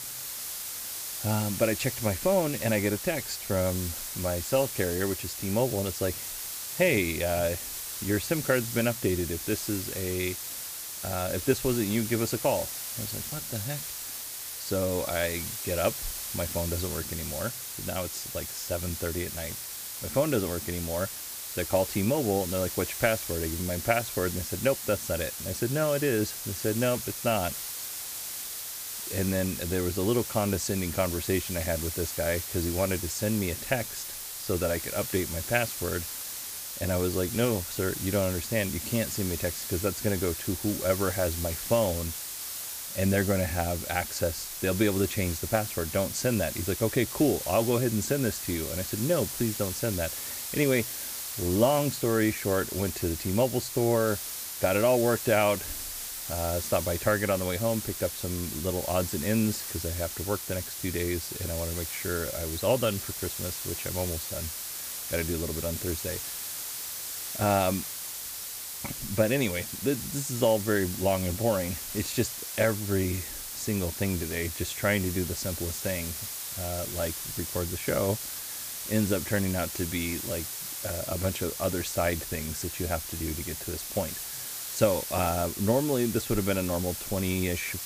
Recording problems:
hiss; loud; throughout; 4 dB below the speech

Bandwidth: 15 kHz